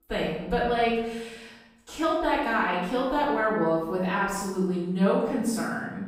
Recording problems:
room echo; strong; dies away in 0.9 s
off-mic speech; far

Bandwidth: 15.5 kHz